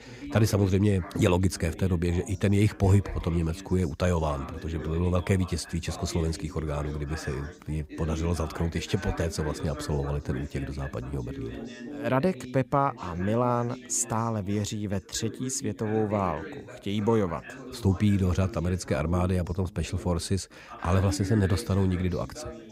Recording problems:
background chatter; noticeable; throughout; 3 voices, 15 dB below the speech

